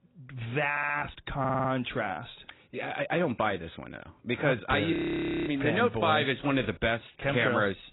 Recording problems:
garbled, watery; badly; nothing above 4 kHz
audio stuttering; at 0.5 s and at 1.5 s
audio freezing; at 5 s for 0.5 s

